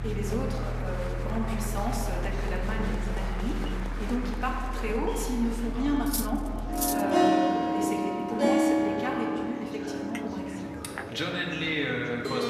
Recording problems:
room echo; noticeable; dies away in 1.8 s
off-mic speech; somewhat distant
background music; very loud; throughout; 1 dB above the speech
chatter from many people; loud; throughout; 8 dB below the speech
traffic noise; very faint; throughout; 20 dB below the speech
clattering dishes; loud; at 6 s; peak 2 dB above the speech
clattering dishes; noticeable; at 10 s; peak 9 dB below the speech

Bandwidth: 14 kHz